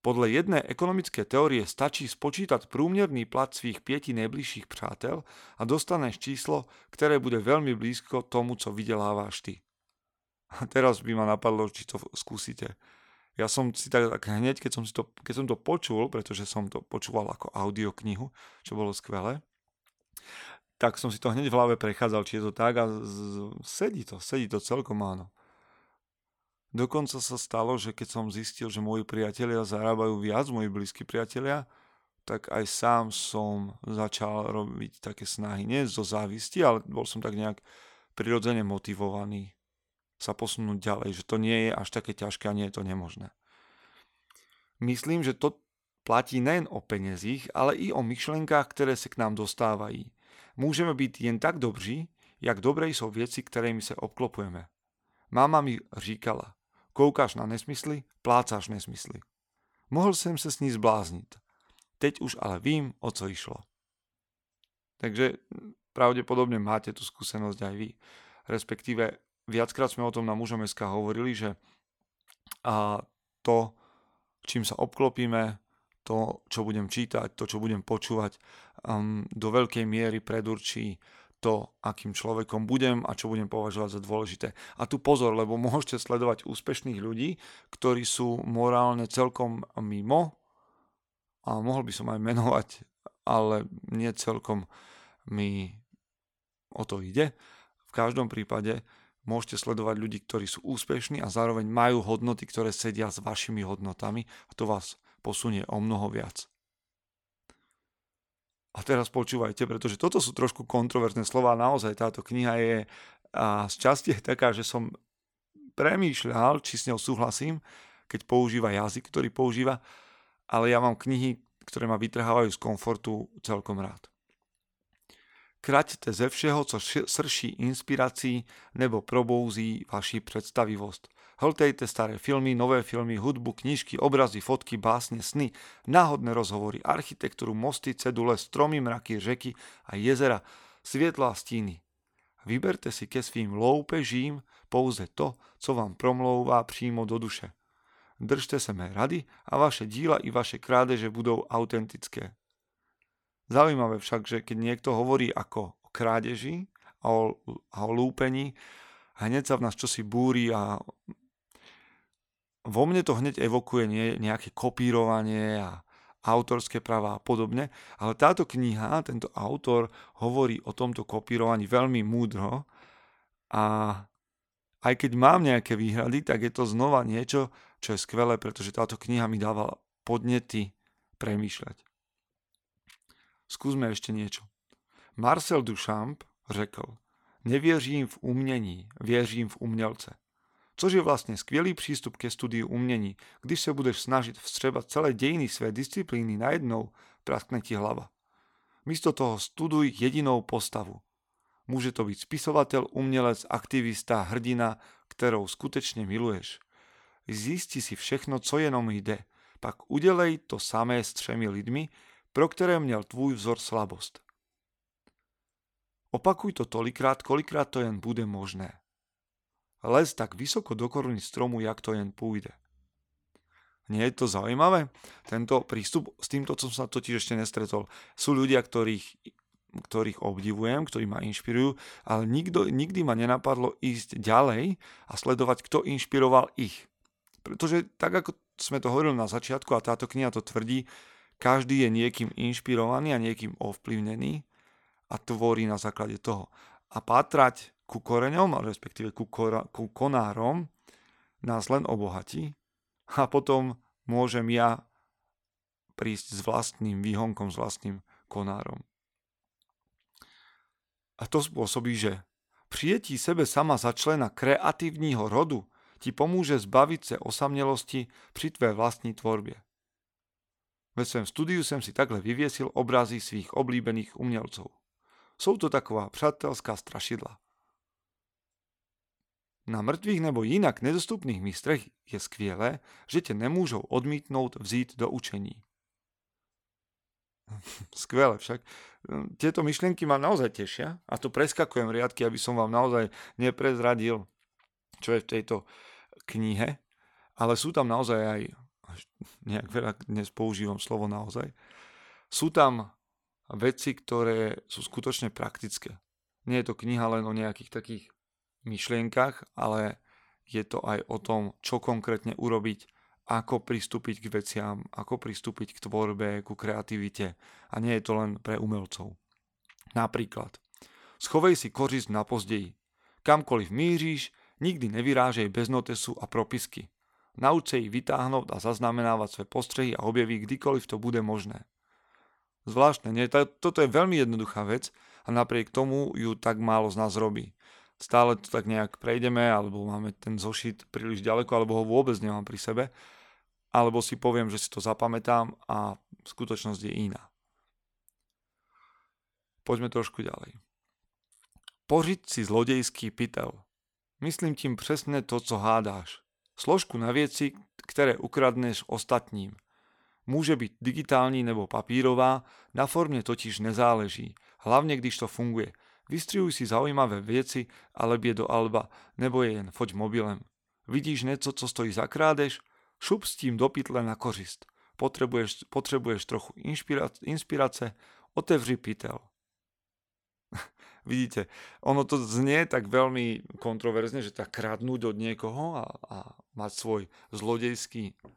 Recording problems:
none

